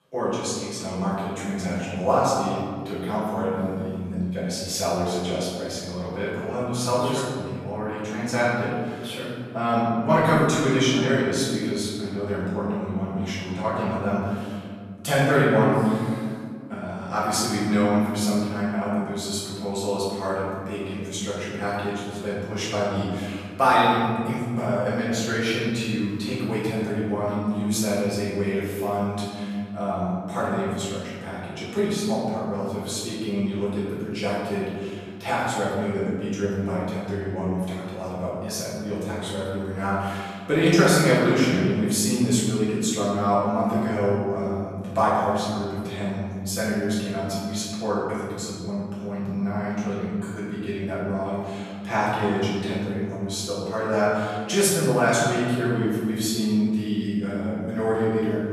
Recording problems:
room echo; strong; dies away in 2.1 s
off-mic speech; far

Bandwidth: 14 kHz